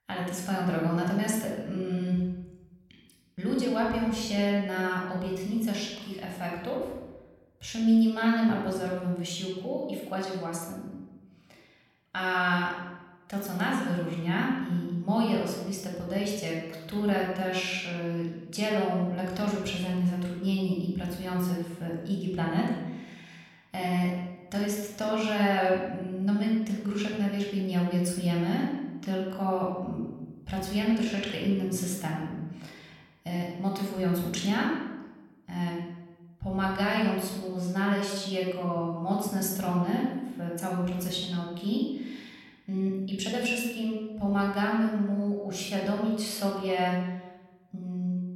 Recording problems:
room echo; noticeable; dies away in 1 s
off-mic speech; somewhat distant

